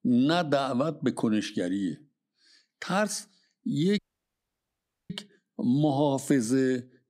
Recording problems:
audio cutting out; at 4 s for 1 s

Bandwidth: 15.5 kHz